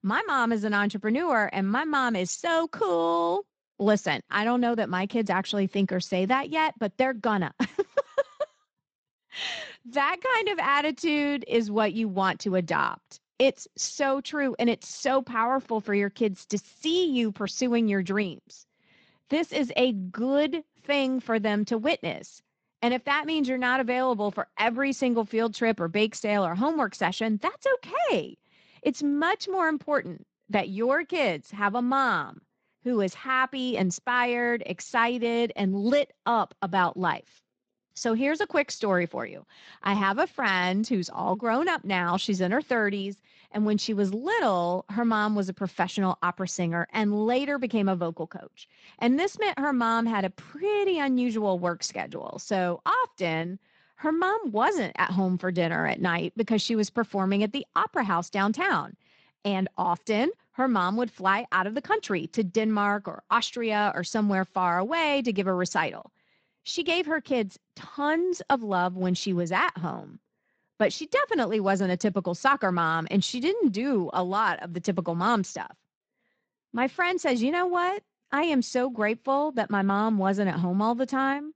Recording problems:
garbled, watery; slightly; nothing above 7.5 kHz

